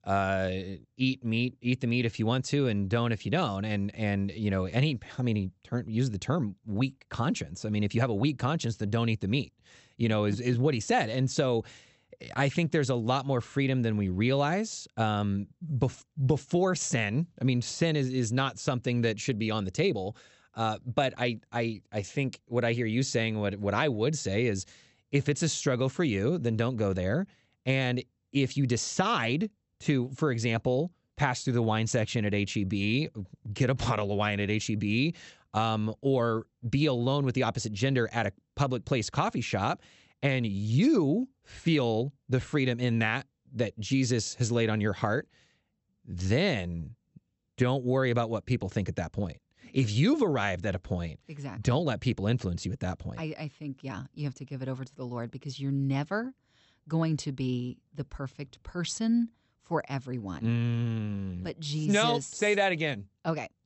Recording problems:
high frequencies cut off; noticeable; nothing above 8 kHz

